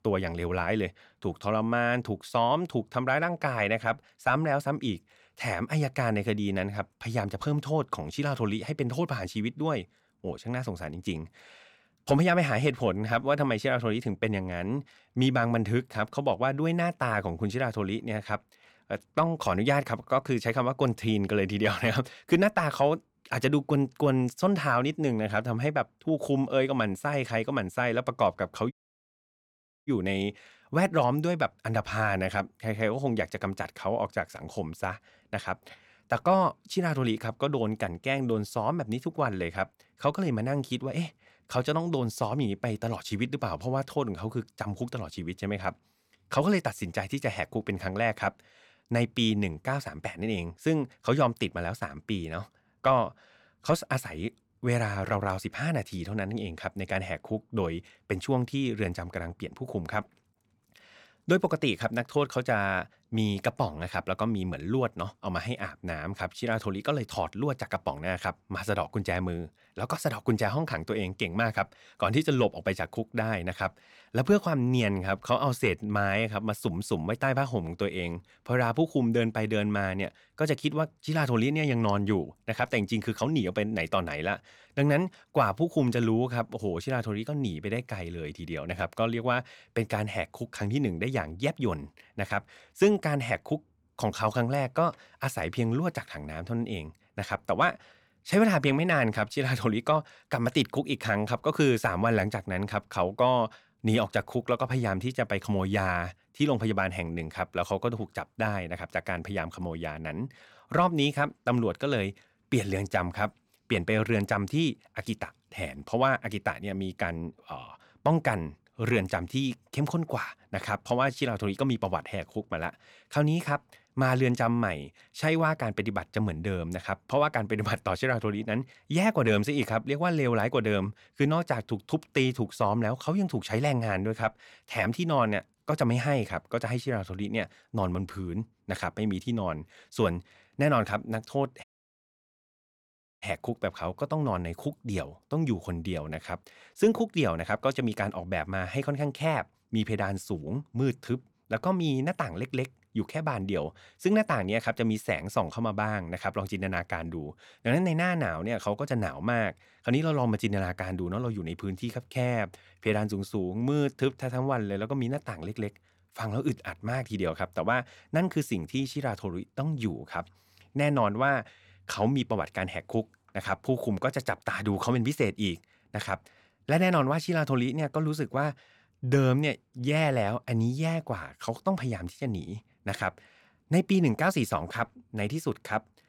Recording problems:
audio cutting out; at 29 s for 1 s and at 2:22 for 1.5 s

